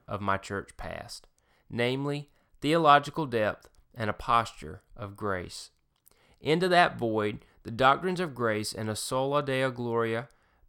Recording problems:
none

